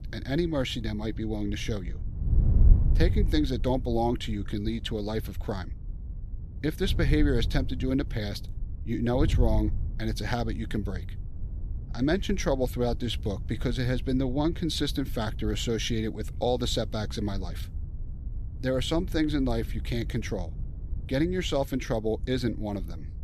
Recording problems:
wind noise on the microphone; occasional gusts; 20 dB below the speech

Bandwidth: 14.5 kHz